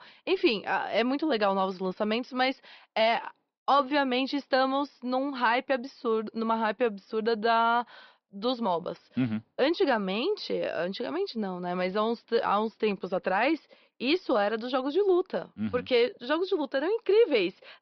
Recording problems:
high frequencies cut off; noticeable; nothing above 5.5 kHz

